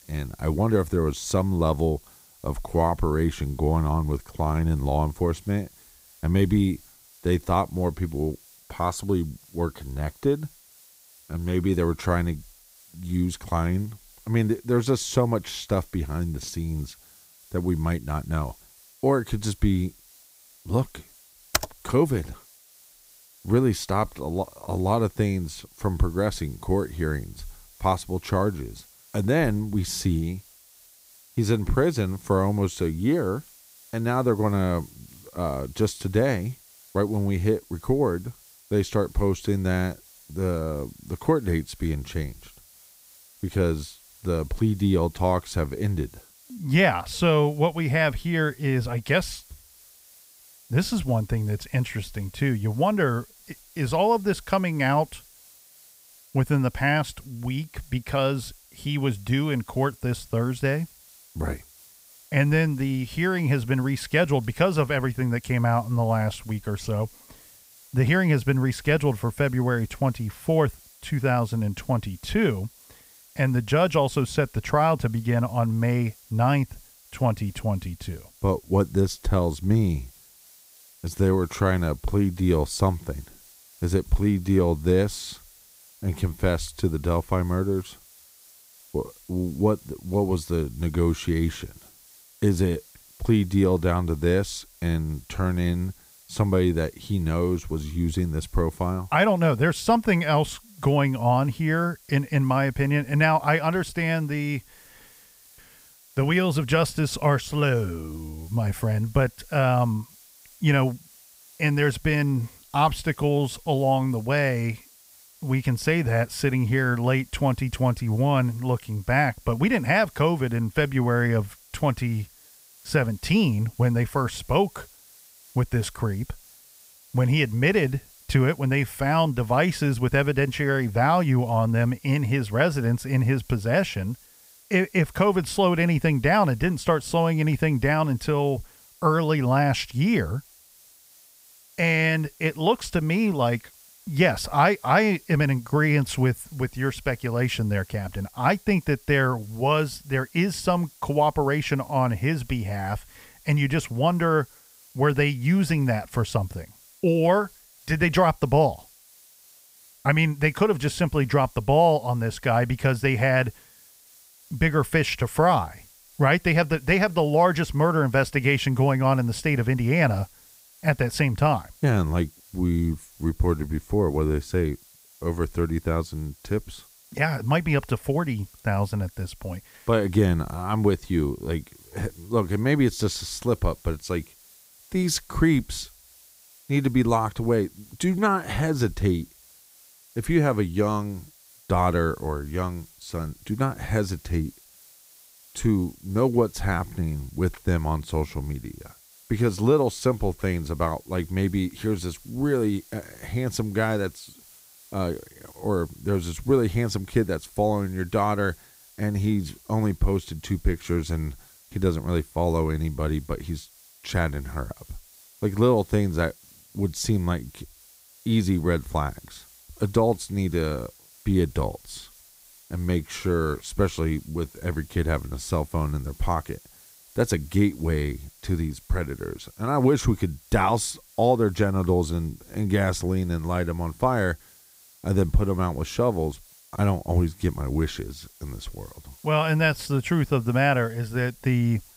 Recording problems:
hiss; faint; throughout; 25 dB below the speech
keyboard typing; noticeable; at 22 s; peak 3 dB below the speech

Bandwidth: 15.5 kHz